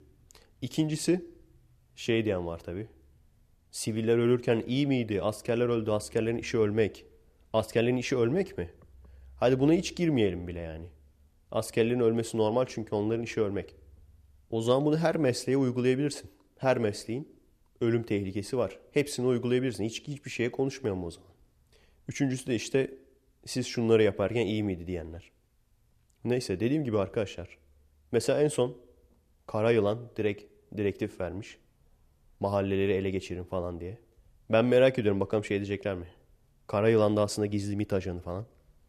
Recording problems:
none

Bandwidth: 14.5 kHz